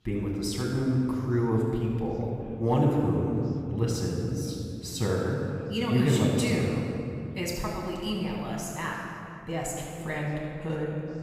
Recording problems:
off-mic speech; far
room echo; noticeable; dies away in 2.7 s
background chatter; faint; throughout; 3 voices, 25 dB below the speech

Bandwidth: 15.5 kHz